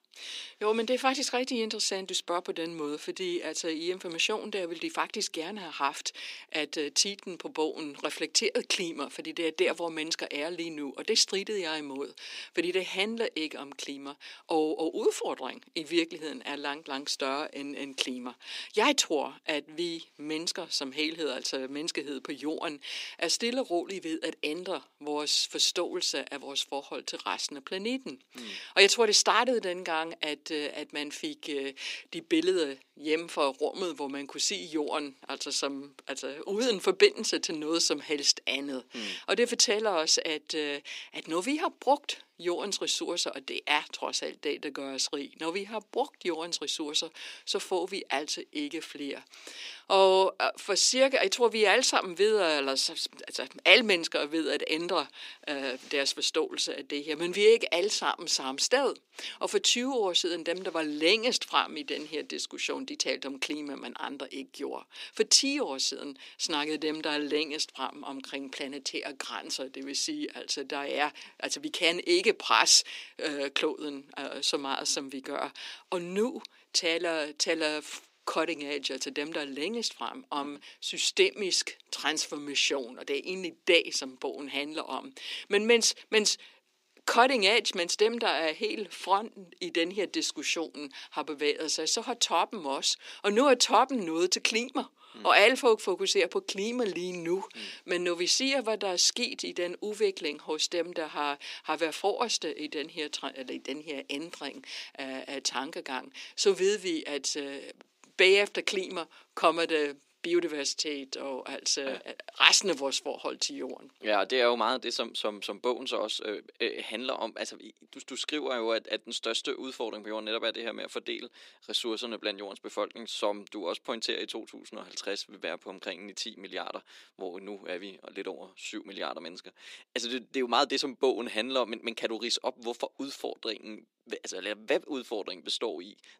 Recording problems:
thin; somewhat; fading below 300 Hz

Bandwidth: 15.5 kHz